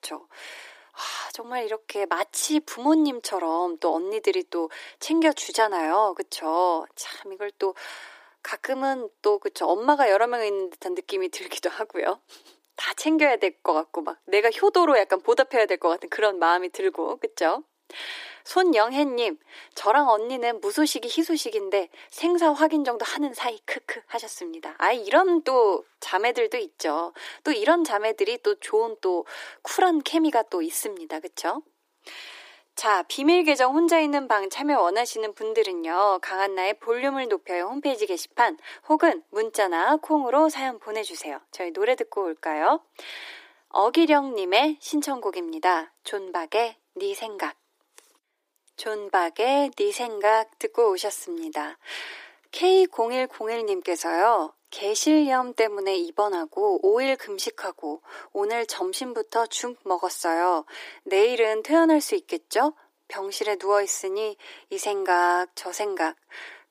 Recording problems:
thin; somewhat; fading below 300 Hz

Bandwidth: 15 kHz